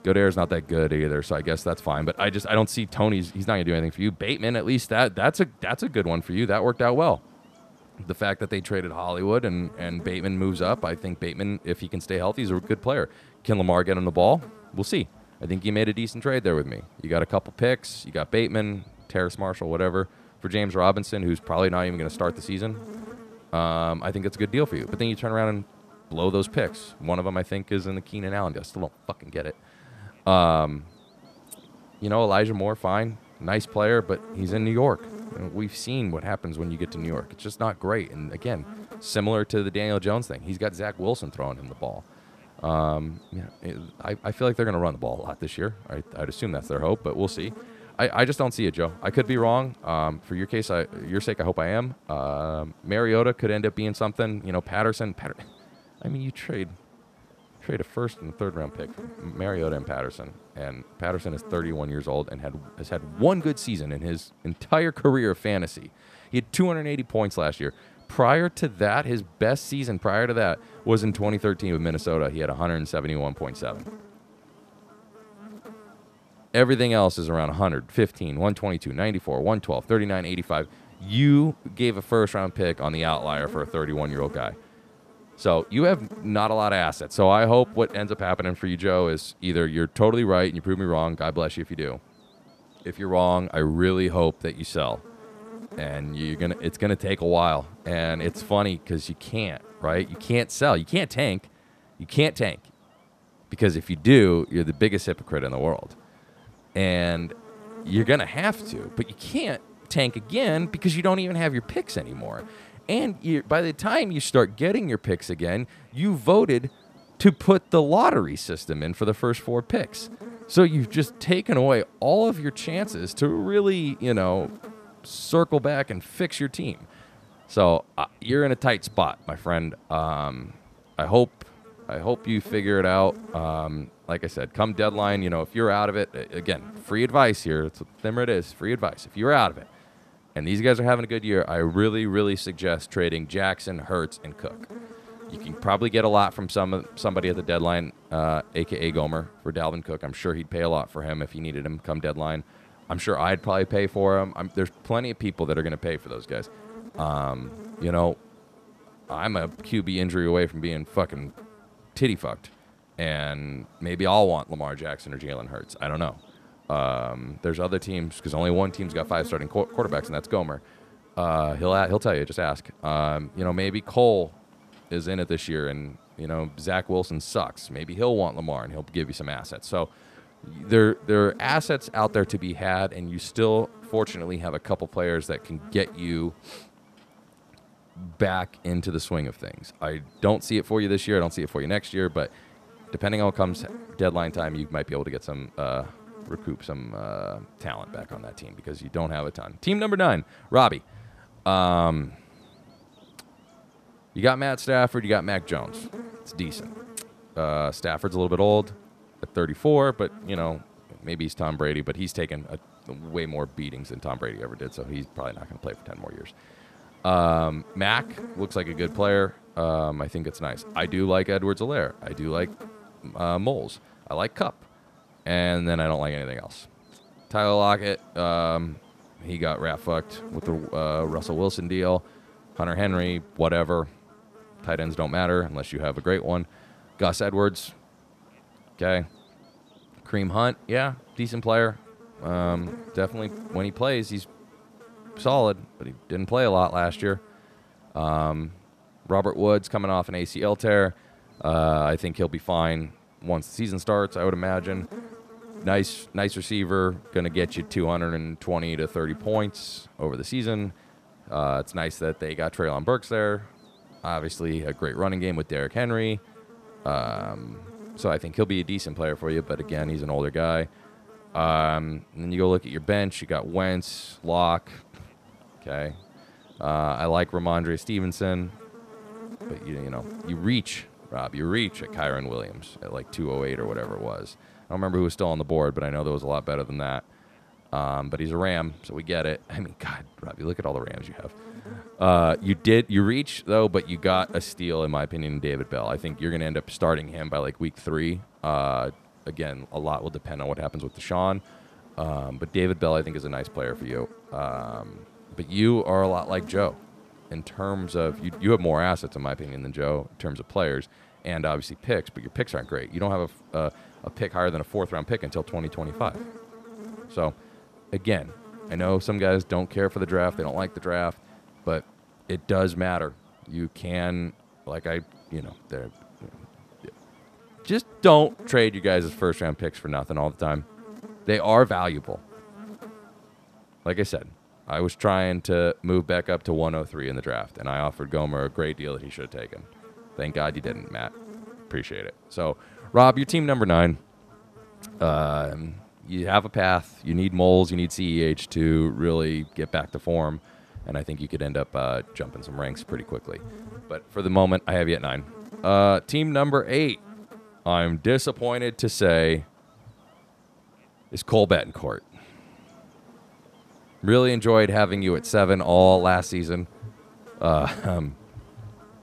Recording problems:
electrical hum; faint; throughout; 50 Hz, 25 dB below the speech

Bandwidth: 14.5 kHz